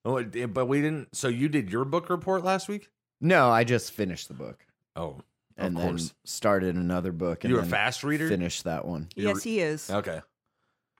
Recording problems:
none

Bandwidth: 16 kHz